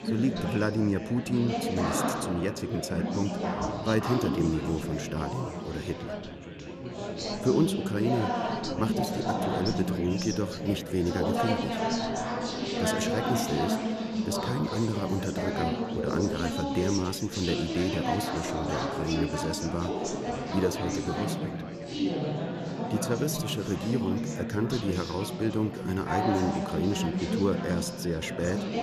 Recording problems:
chatter from many people; loud; throughout; 1 dB below the speech

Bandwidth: 13.5 kHz